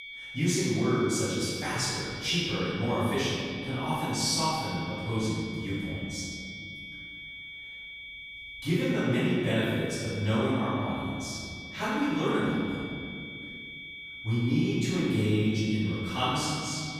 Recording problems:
room echo; strong; dies away in 2.2 s
off-mic speech; far
high-pitched whine; noticeable; throughout; 2.5 kHz, 10 dB below the speech

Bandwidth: 15 kHz